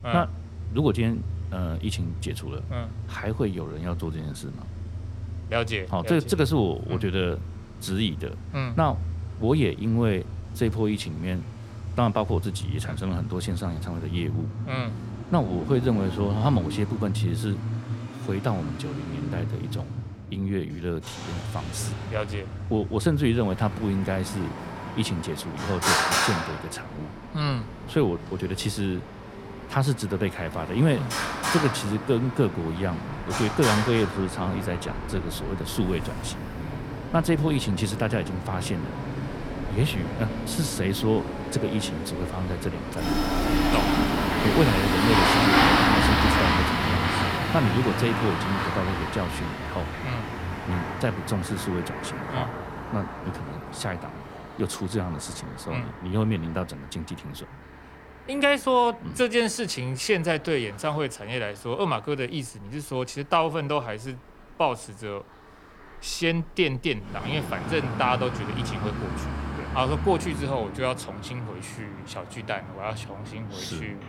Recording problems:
traffic noise; loud; throughout; 1 dB below the speech

